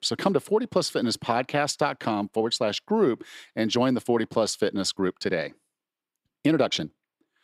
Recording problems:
uneven, jittery; strongly; from 2 to 7 s

